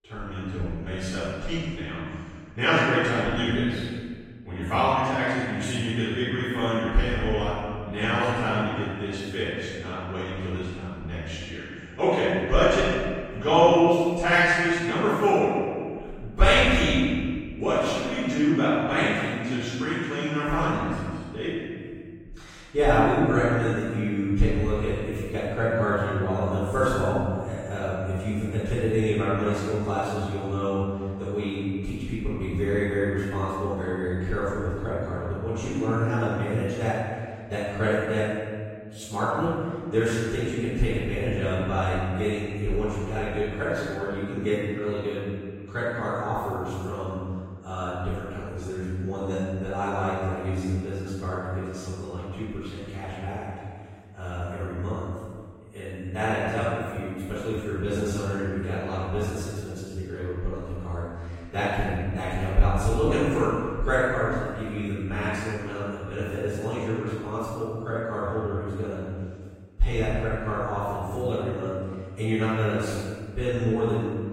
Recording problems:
room echo; strong; dies away in 1.7 s
off-mic speech; far
garbled, watery; slightly; nothing above 16 kHz

